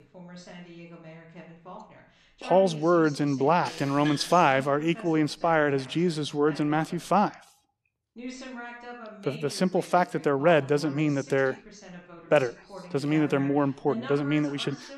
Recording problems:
voice in the background; noticeable; throughout; 20 dB below the speech

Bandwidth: 14 kHz